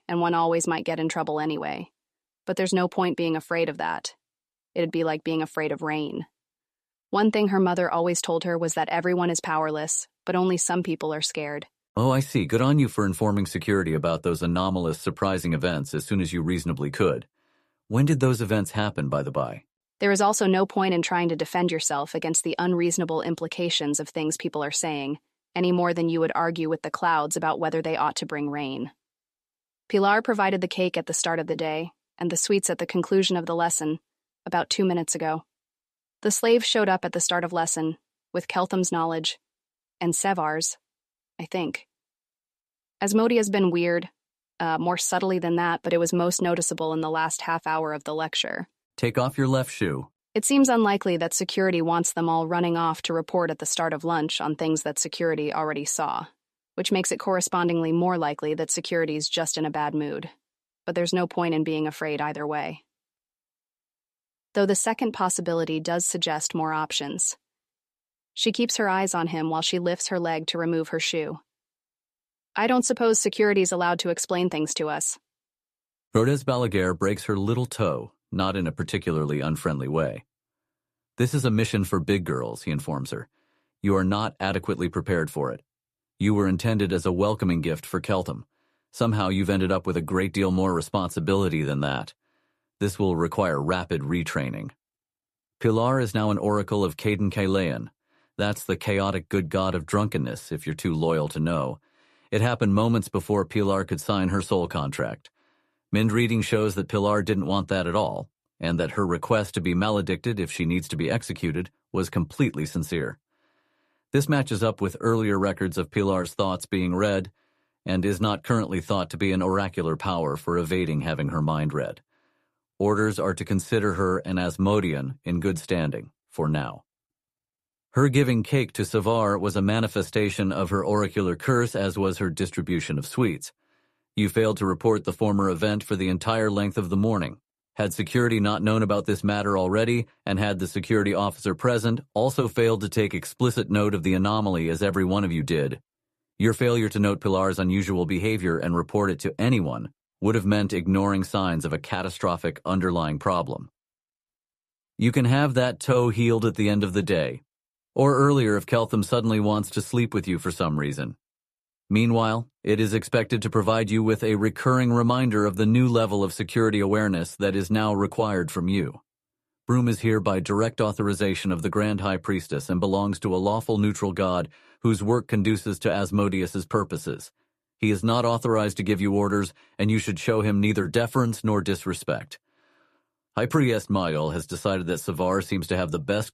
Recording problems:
none

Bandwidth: 14 kHz